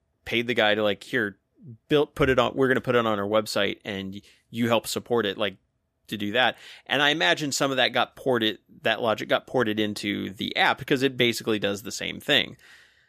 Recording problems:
none

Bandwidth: 14.5 kHz